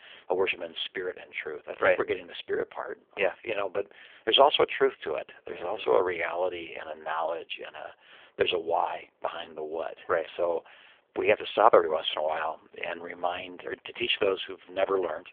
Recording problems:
phone-call audio; poor line; nothing above 3.5 kHz

